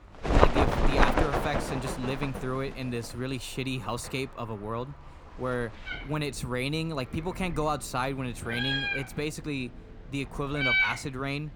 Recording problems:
animal sounds; very loud; throughout; 5 dB above the speech

